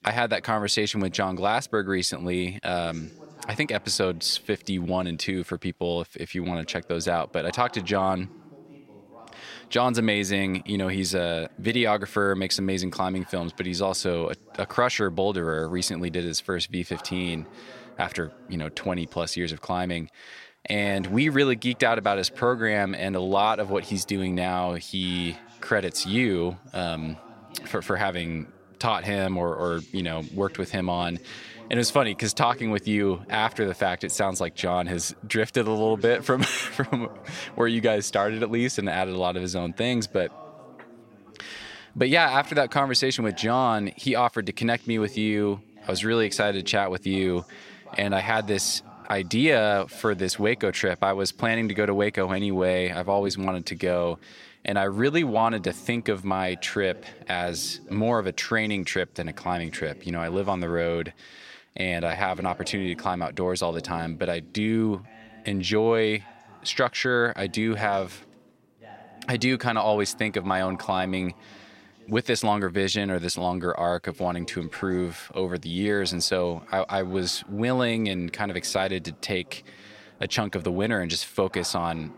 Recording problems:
voice in the background; faint; throughout; 20 dB below the speech

